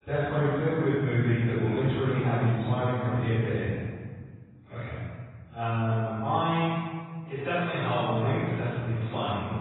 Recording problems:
room echo; strong; dies away in 1.6 s
off-mic speech; far
garbled, watery; badly; nothing above 4 kHz

